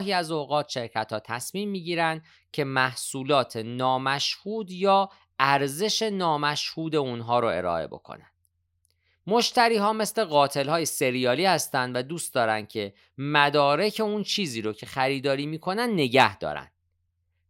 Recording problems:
abrupt cut into speech; at the start

